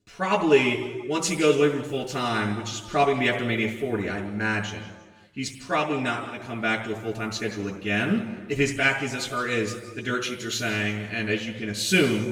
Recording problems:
off-mic speech; far
room echo; noticeable; dies away in 1.2 s

